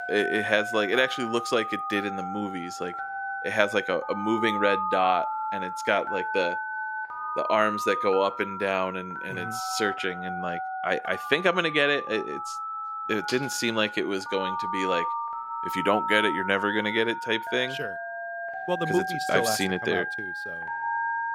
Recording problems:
alarms or sirens; loud; throughout; 5 dB below the speech

